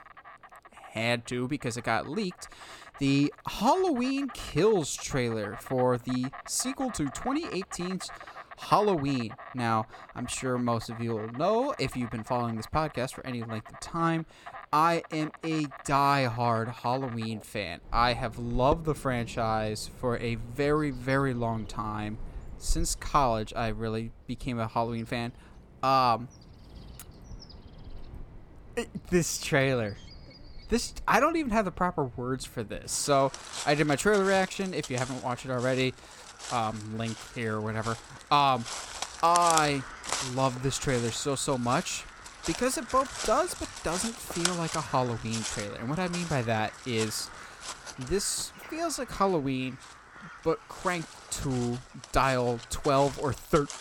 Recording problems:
animal sounds; noticeable; throughout; 10 dB below the speech

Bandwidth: 17.5 kHz